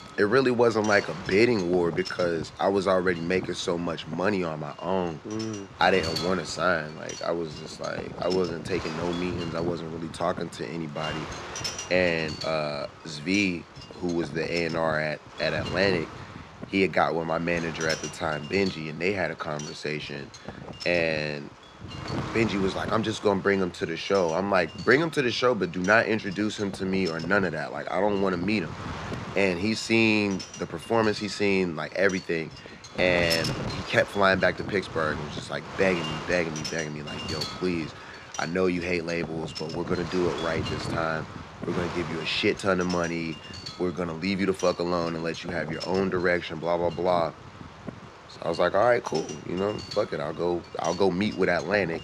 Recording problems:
wind noise on the microphone; occasional gusts; 10 dB below the speech

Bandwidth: 13.5 kHz